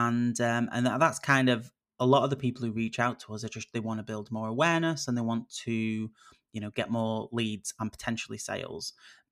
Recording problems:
abrupt cut into speech; at the start

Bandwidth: 14.5 kHz